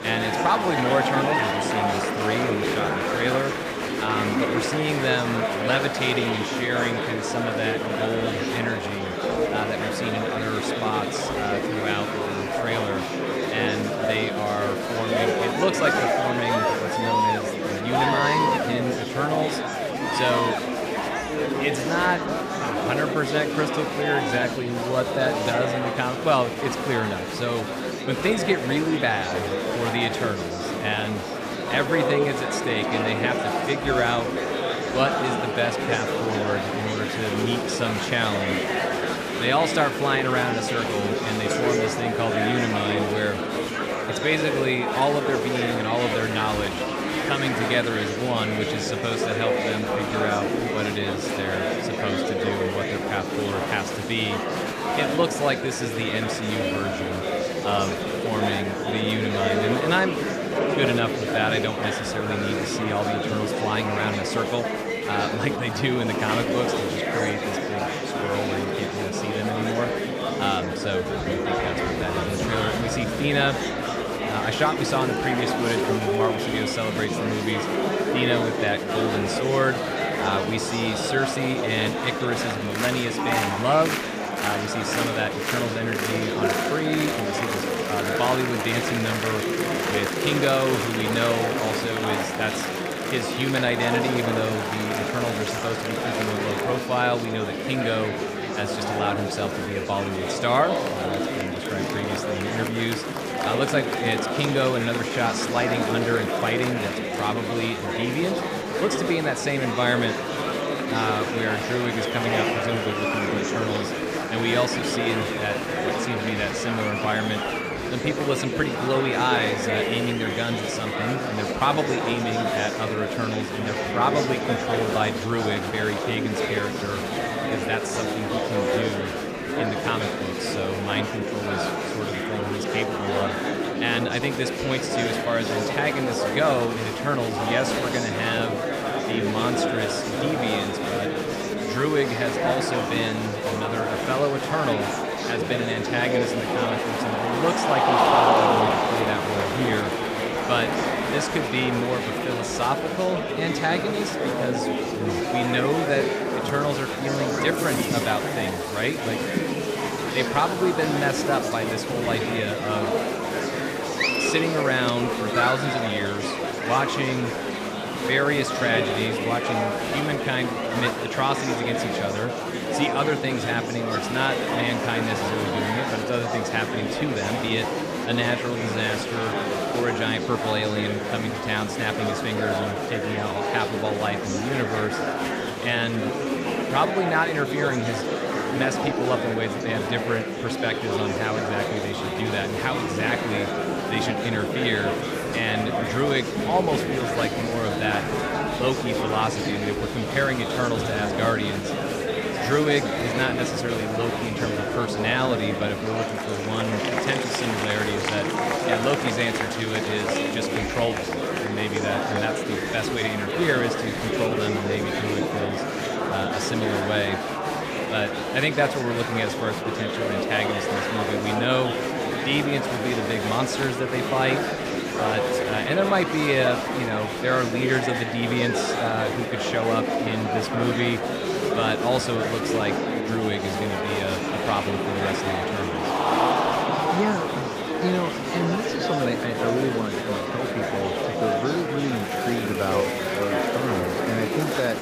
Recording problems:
murmuring crowd; very loud; throughout; 1 dB above the speech

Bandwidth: 15 kHz